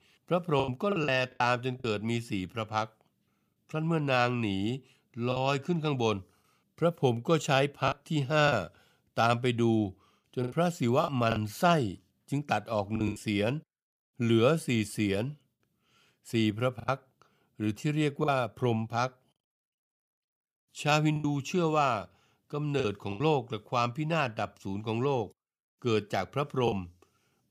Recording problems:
choppy; very; 6% of the speech affected

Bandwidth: 15 kHz